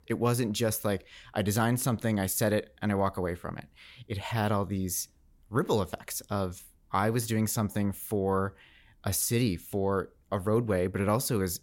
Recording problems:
none

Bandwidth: 16.5 kHz